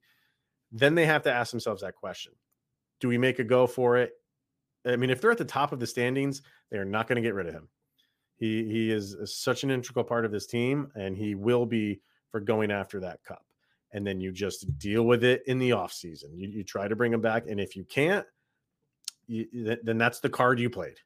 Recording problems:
none

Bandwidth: 15 kHz